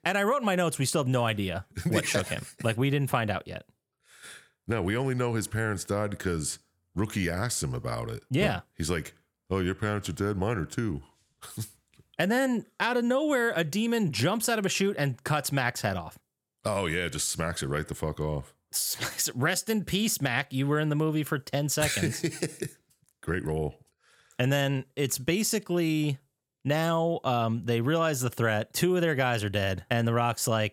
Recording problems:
none

